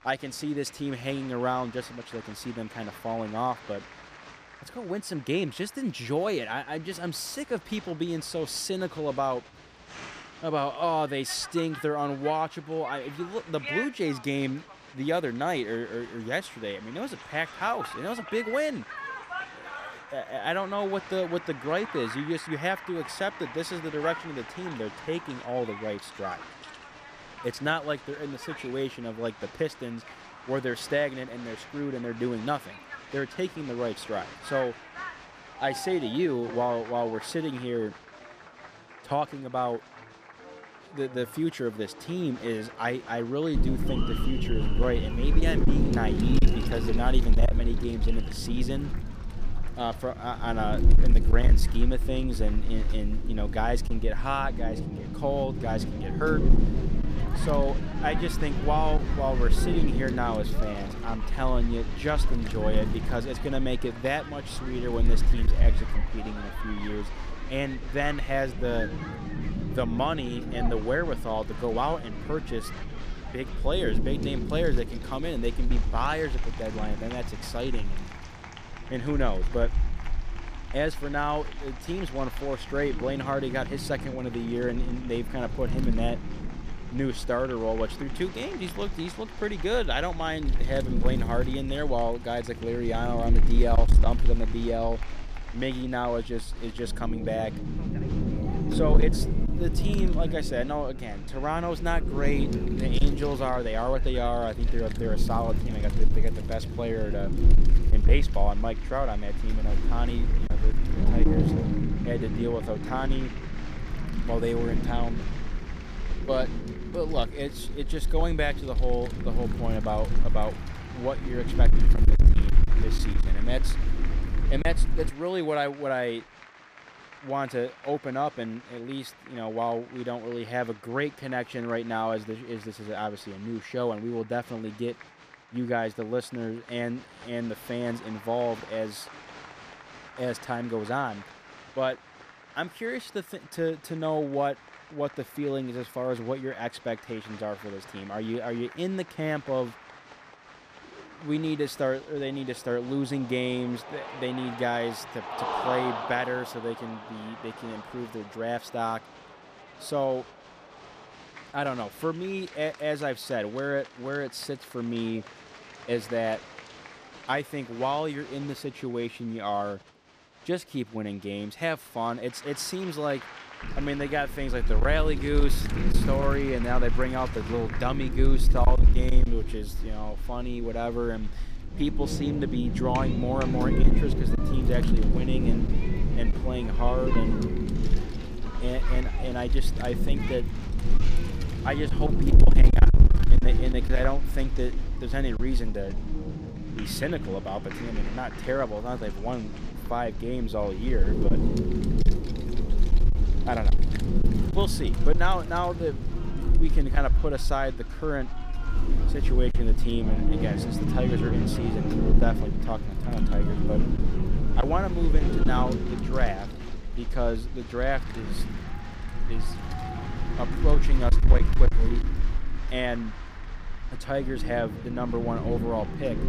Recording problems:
distortion; slight; 1.2% of the sound clipped
wind noise on the microphone; heavy; from 44 s to 2:05 and from 2:54 on; 8 dB below the speech
crowd noise; noticeable; throughout; 15 dB below the speech

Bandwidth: 15 kHz